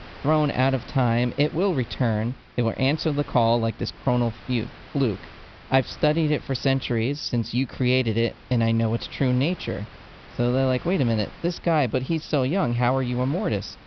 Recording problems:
high frequencies cut off; noticeable; nothing above 5.5 kHz
wind noise on the microphone; occasional gusts; 20 dB below the speech

